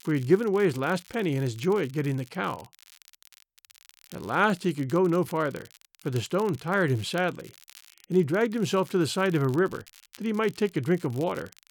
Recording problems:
crackle, like an old record; faint; 25 dB below the speech

